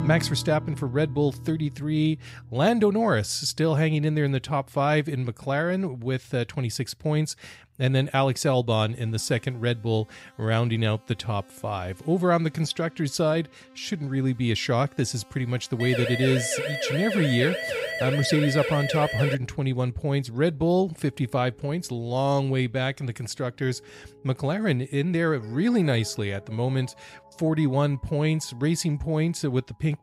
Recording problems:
background music; faint; throughout; 20 dB below the speech
siren; noticeable; from 16 to 19 s; peak 3 dB below the speech

